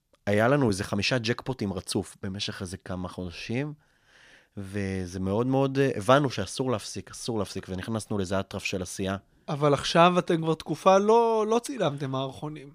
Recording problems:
none

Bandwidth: 15 kHz